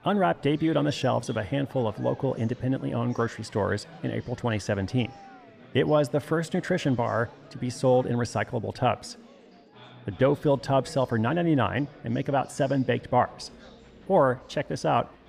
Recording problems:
chatter from many people; faint; throughout; 20 dB below the speech

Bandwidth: 15 kHz